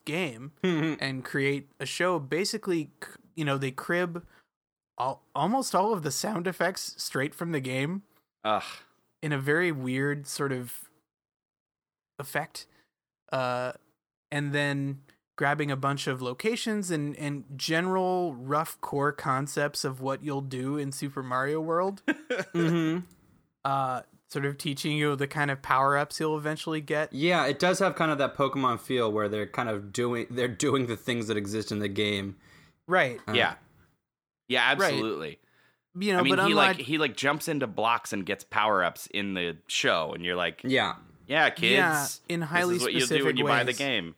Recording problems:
none

